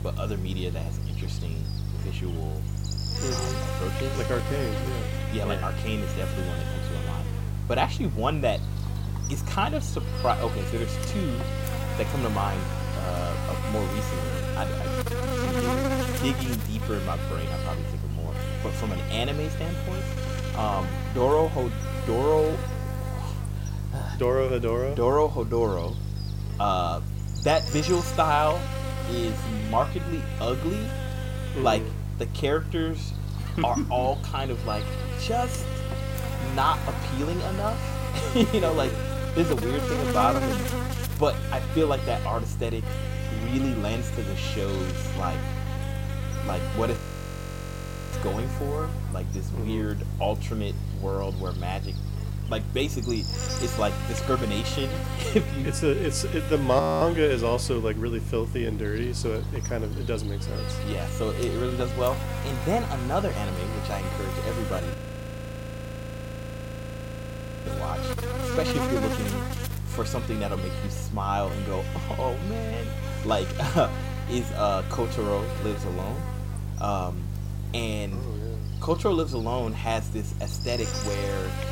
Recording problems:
electrical hum; loud; throughout; 50 Hz, 7 dB below the speech
audio freezing; at 47 s for 1 s, at 57 s and at 1:05 for 2.5 s

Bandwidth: 16 kHz